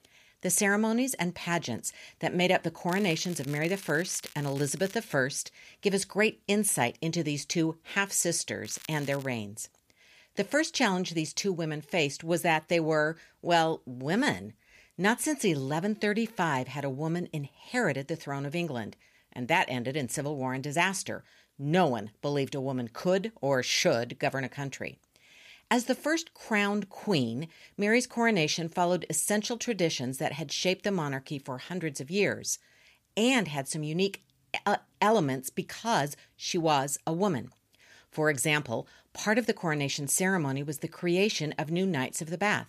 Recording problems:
crackling; noticeable; from 3 to 5 s and at 8.5 s; 20 dB below the speech

